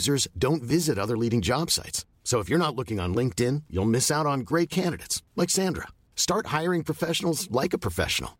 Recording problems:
abrupt cut into speech; at the start

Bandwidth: 16 kHz